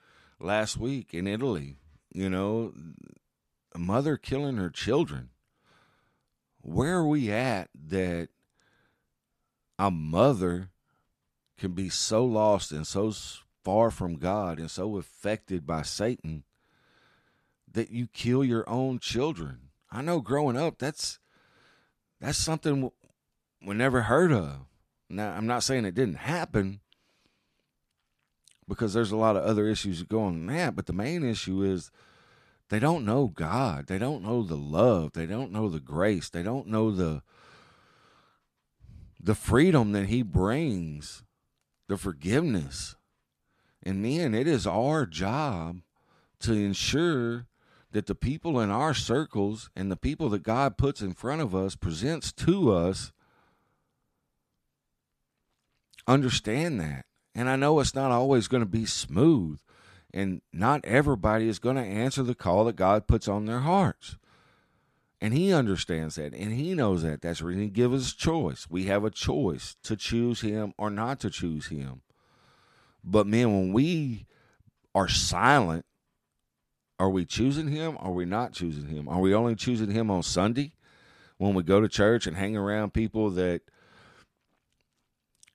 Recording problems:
none

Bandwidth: 14 kHz